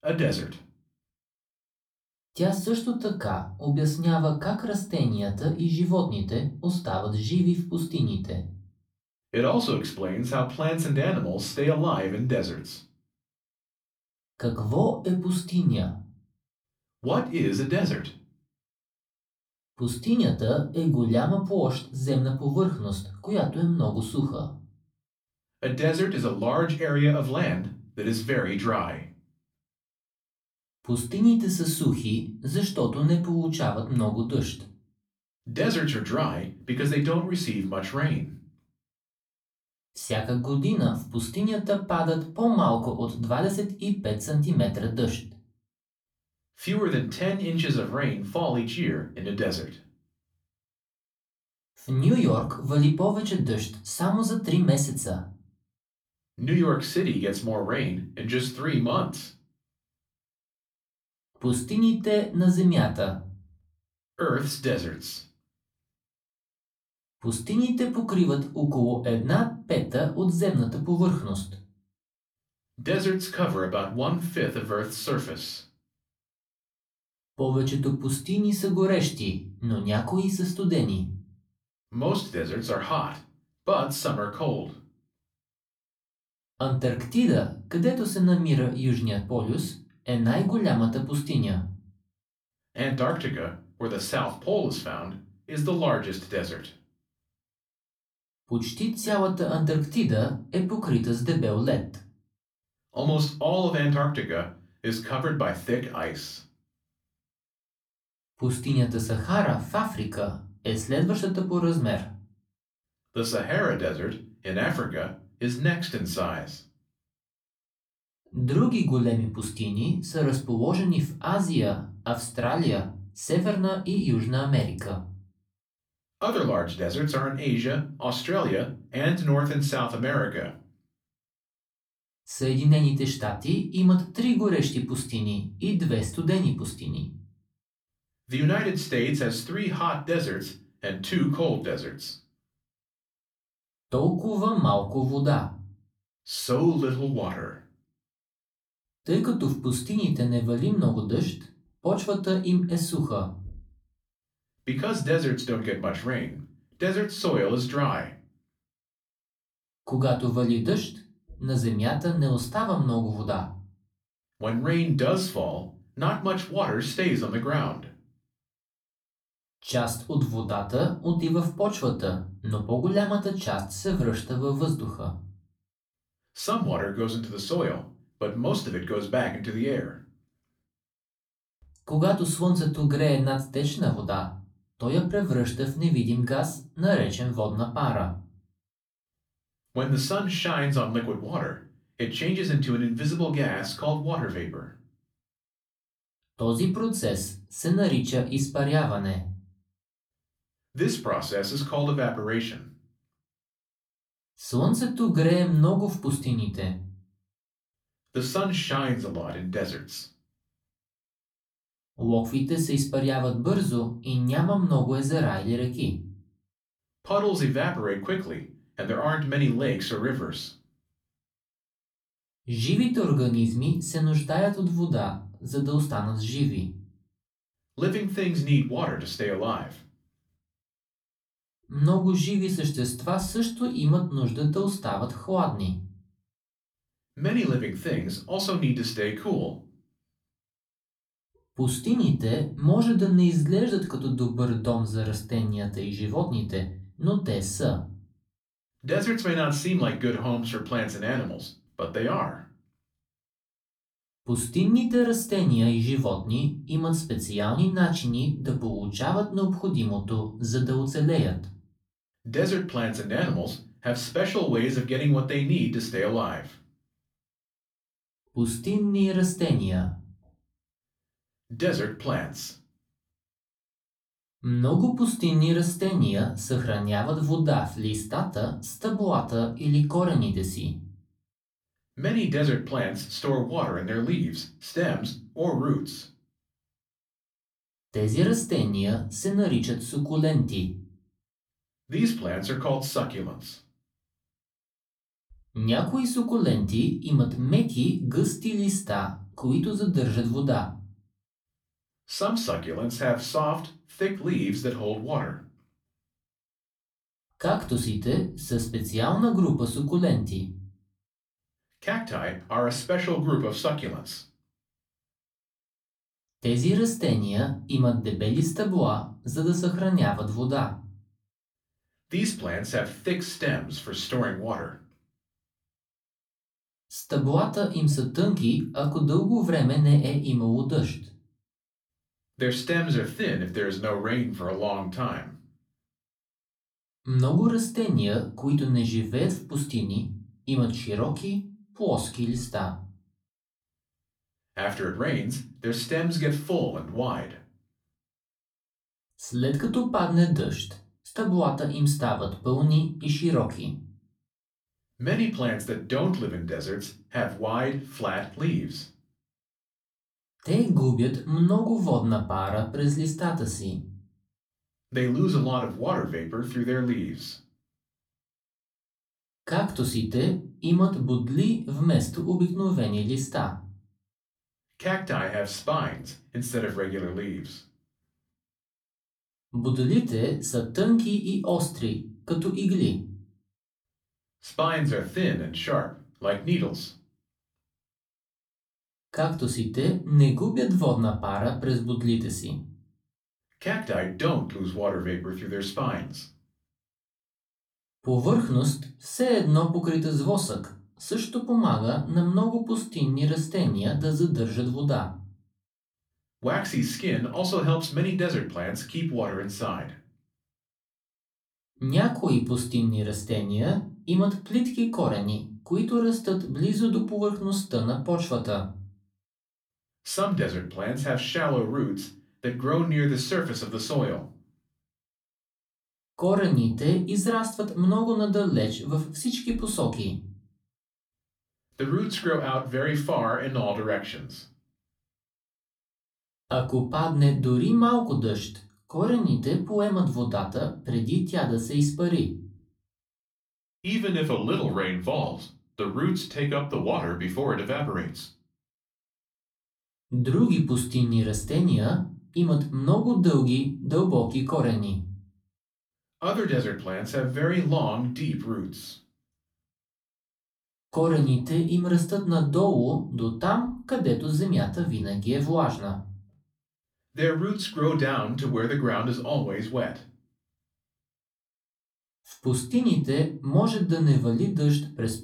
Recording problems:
off-mic speech; far
room echo; very slight; dies away in 0.3 s

